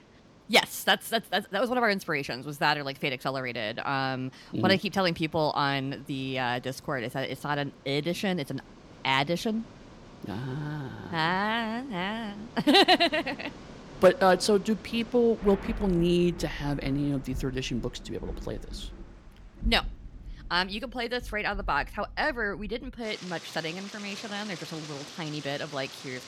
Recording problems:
rain or running water; noticeable; throughout; 15 dB below the speech

